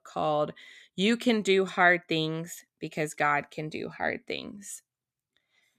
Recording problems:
none

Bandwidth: 14.5 kHz